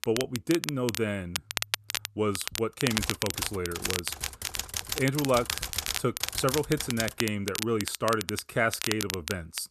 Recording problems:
crackle, like an old record; loud; 4 dB below the speech
keyboard typing; noticeable; from 3 to 7 s; peak 2 dB below the speech

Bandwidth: 13.5 kHz